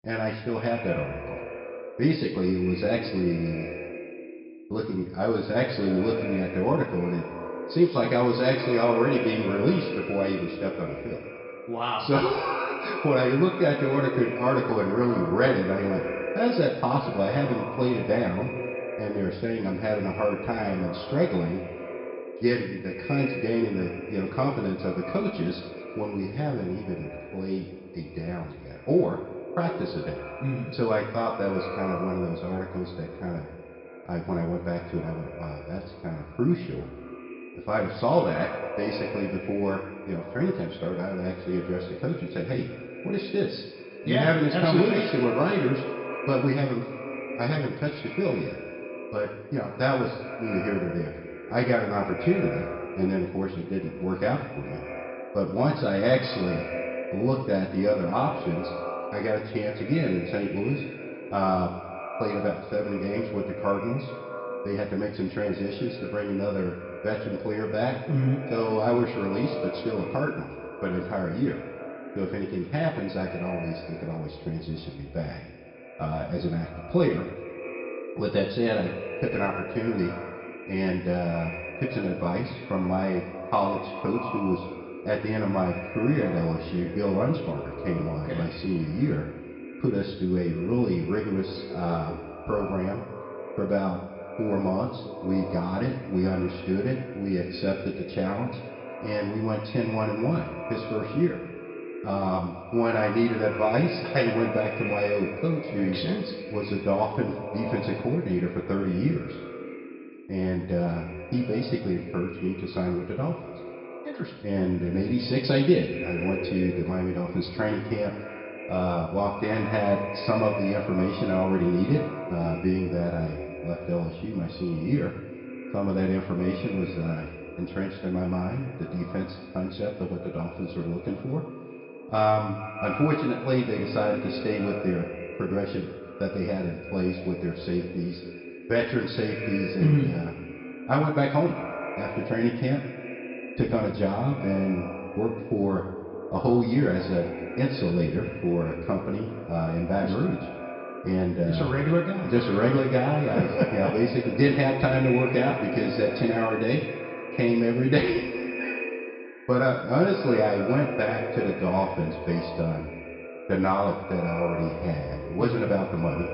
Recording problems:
echo of what is said; strong; throughout; 190 ms later, 9 dB below the speech
high frequencies cut off; noticeable; nothing above 5.5 kHz
room echo; slight; dies away in 0.8 s
off-mic speech; somewhat distant

